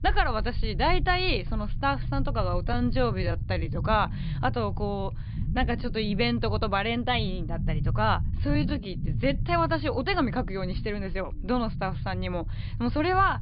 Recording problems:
high frequencies cut off; severe; nothing above 5 kHz
low rumble; noticeable; throughout; 20 dB below the speech
uneven, jittery; strongly; from 2.5 to 9.5 s

